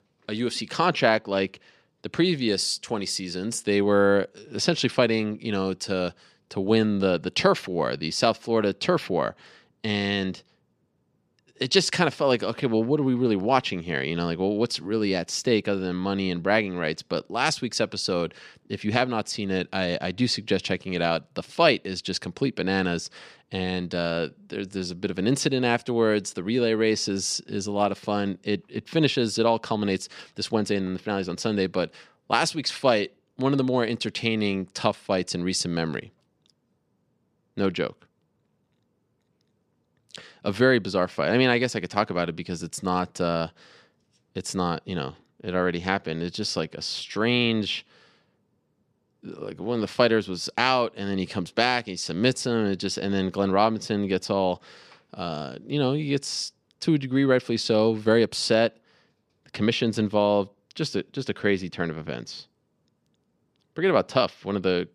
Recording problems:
none

